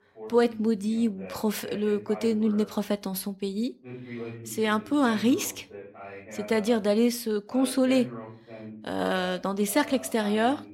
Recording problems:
voice in the background; noticeable; throughout; 15 dB below the speech

